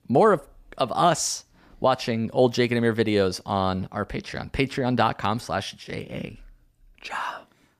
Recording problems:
none

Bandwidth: 14.5 kHz